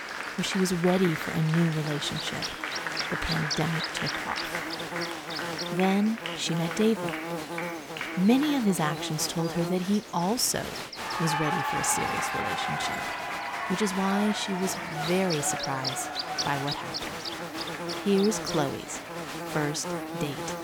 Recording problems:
electrical hum; loud; throughout; 60 Hz, 5 dB below the speech
crowd noise; loud; throughout; 5 dB below the speech

